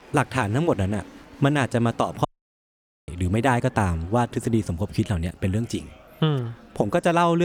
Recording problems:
murmuring crowd; faint; throughout; 25 dB below the speech
audio cutting out; at 2.5 s for 1 s
abrupt cut into speech; at the end

